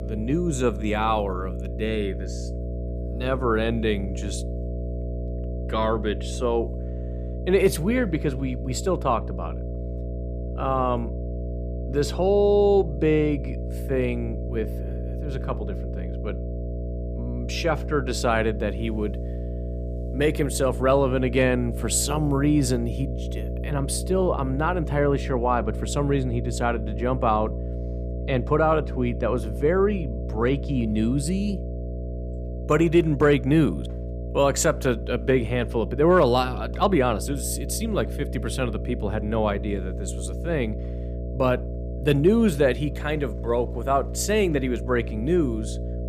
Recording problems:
electrical hum; noticeable; throughout; 60 Hz, 15 dB below the speech

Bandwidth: 15 kHz